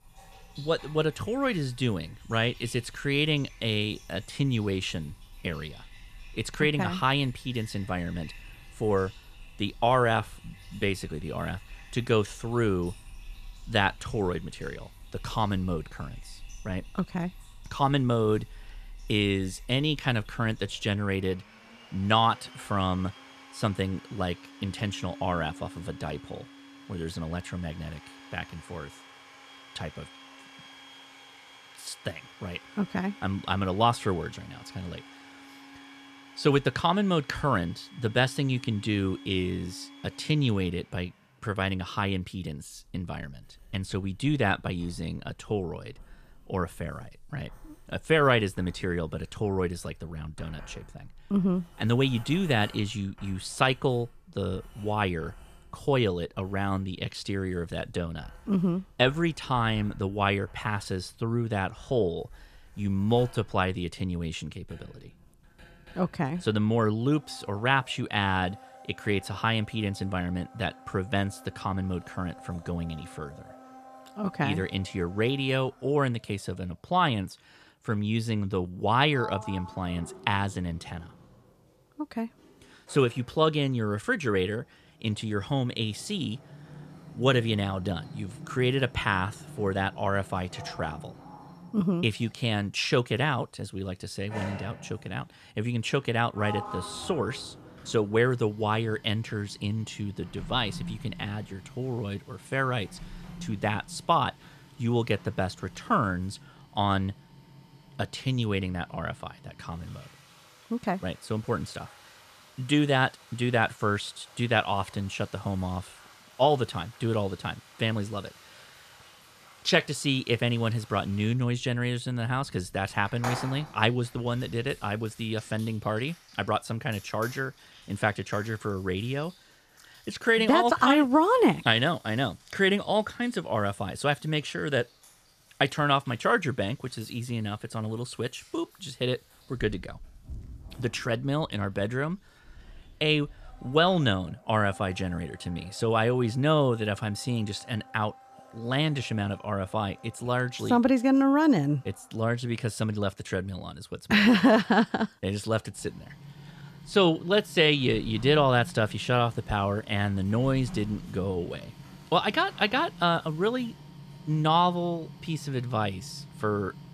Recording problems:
household noises; faint; throughout; 20 dB below the speech

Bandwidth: 14.5 kHz